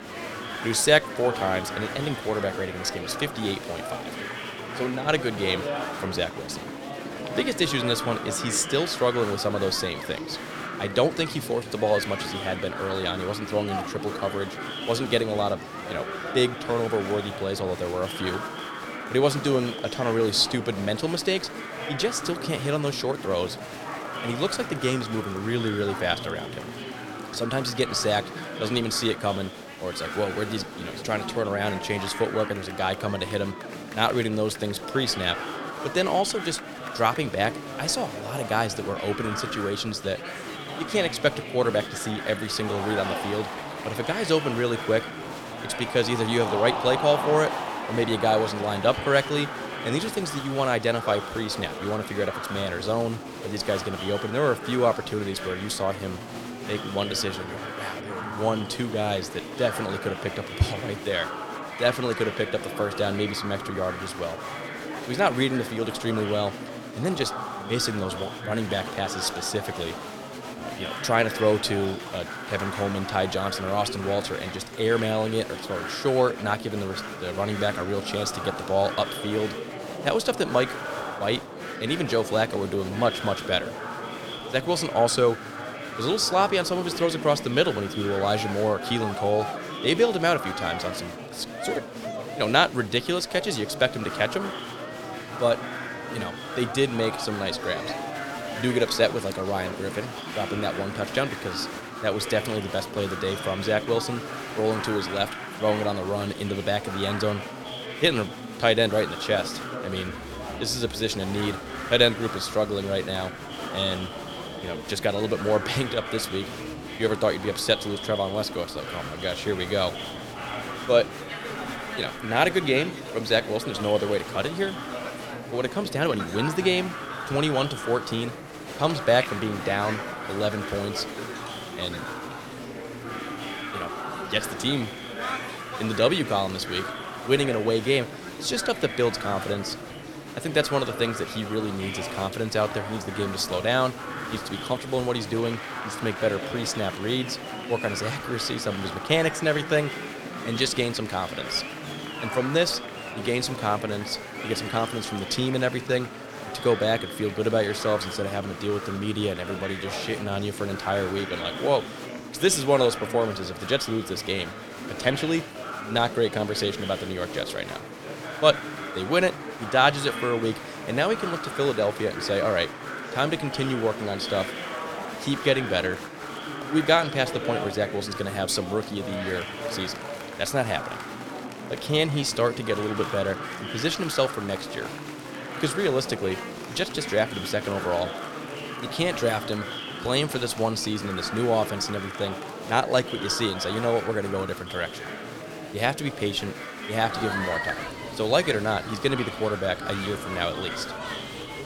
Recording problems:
chatter from many people; loud; throughout; 7 dB below the speech

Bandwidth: 17.5 kHz